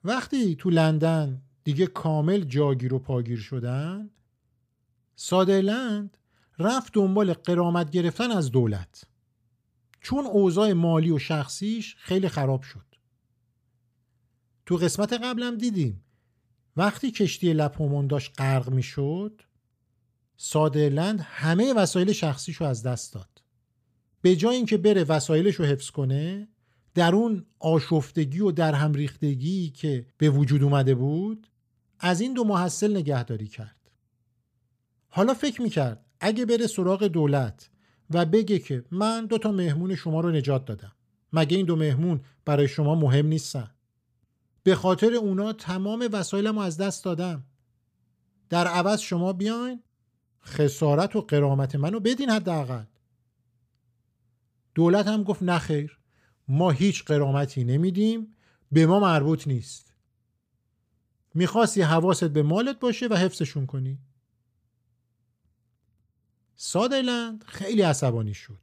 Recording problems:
none

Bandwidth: 15 kHz